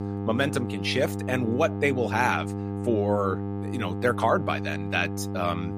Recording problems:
electrical hum; noticeable; throughout; 50 Hz, 10 dB below the speech

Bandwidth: 15 kHz